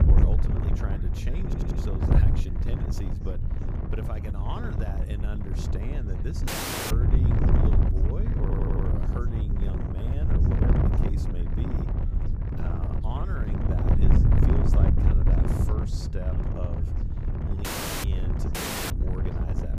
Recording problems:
wind noise on the microphone; heavy; 4 dB above the speech
background chatter; noticeable; throughout; 4 voices, 20 dB below the speech
low rumble; noticeable; throughout; 15 dB below the speech
audio stuttering; at 1.5 s and at 8.5 s
audio cutting out; at 6.5 s, at 18 s and at 19 s

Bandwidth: 15 kHz